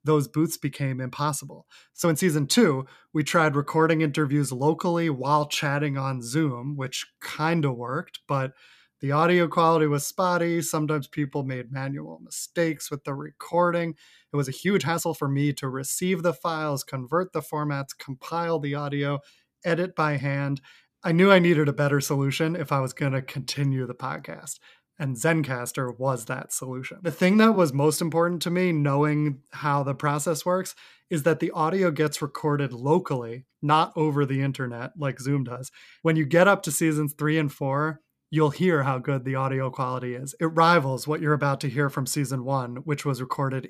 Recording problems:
uneven, jittery; strongly; from 2 to 36 s

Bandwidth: 14.5 kHz